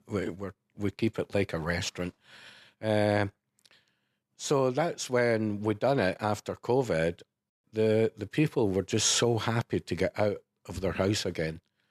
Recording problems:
none

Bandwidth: 13.5 kHz